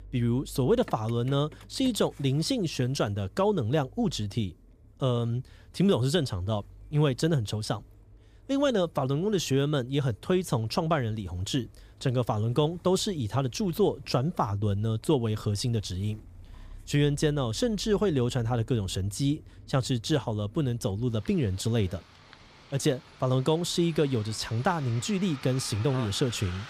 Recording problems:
traffic noise; faint; throughout; 20 dB below the speech

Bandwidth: 15 kHz